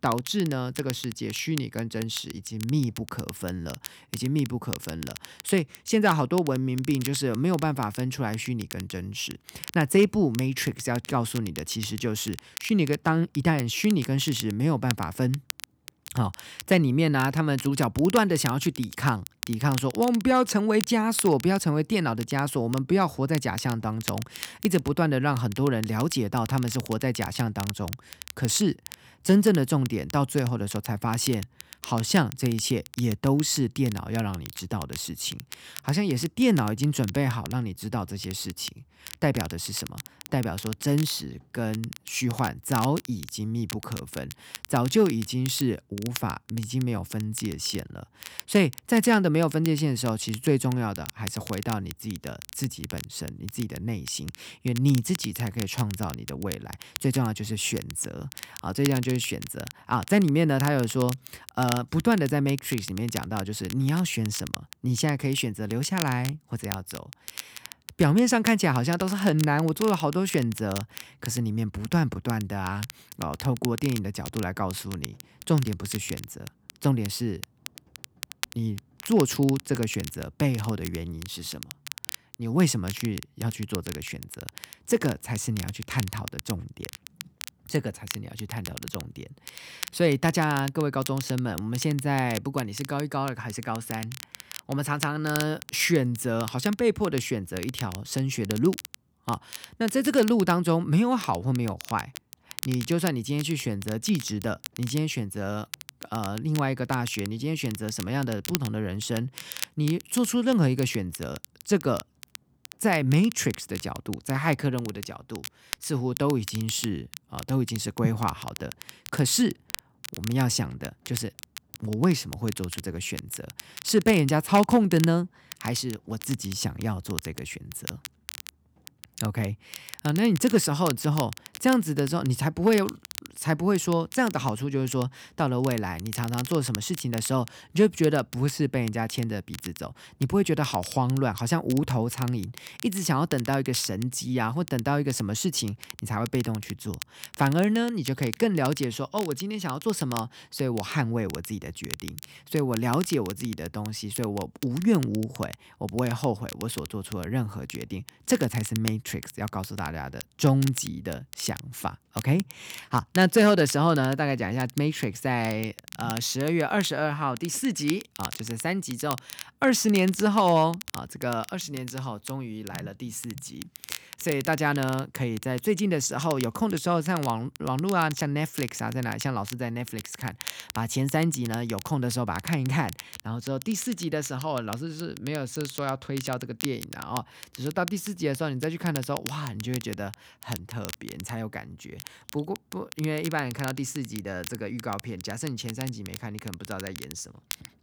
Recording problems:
crackle, like an old record; noticeable; 15 dB below the speech

